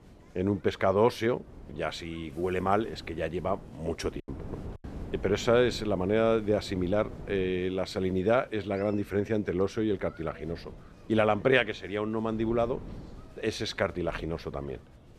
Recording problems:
wind noise on the microphone; occasional gusts; 25 dB below the speech
chatter from many people; faint; throughout; 30 dB below the speech
choppy; occasionally; at 4 s; 5% of the speech affected

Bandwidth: 14 kHz